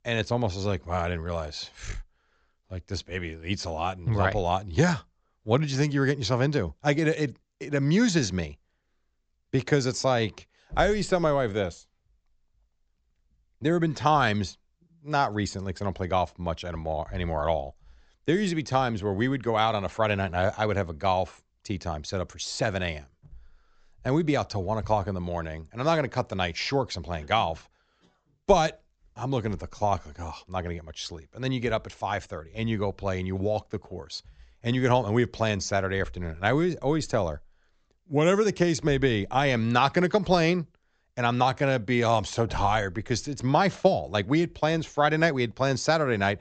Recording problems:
high frequencies cut off; noticeable; nothing above 8 kHz

